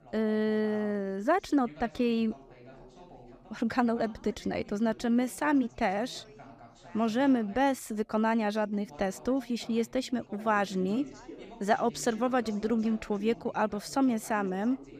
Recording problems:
background chatter; faint; throughout; 3 voices, 20 dB below the speech

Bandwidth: 15 kHz